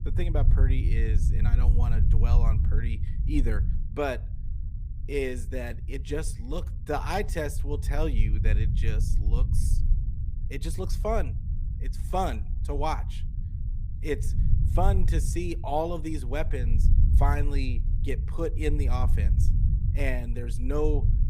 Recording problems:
low rumble; noticeable; throughout; 10 dB below the speech

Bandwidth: 15 kHz